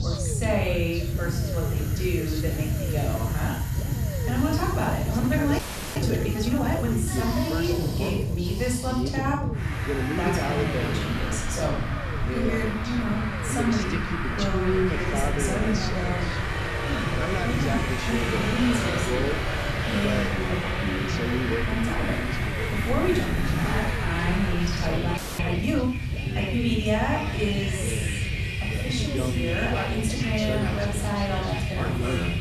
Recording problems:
off-mic speech; far
room echo; noticeable; dies away in 0.5 s
traffic noise; loud; throughout; 3 dB below the speech
voice in the background; loud; throughout; 5 dB below the speech
low rumble; noticeable; throughout; 10 dB below the speech
audio freezing; at 5.5 s and at 25 s

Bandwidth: 13.5 kHz